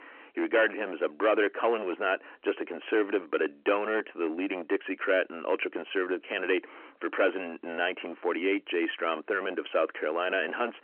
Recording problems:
distortion; heavy; 10% of the sound clipped
phone-call audio; nothing above 3 kHz

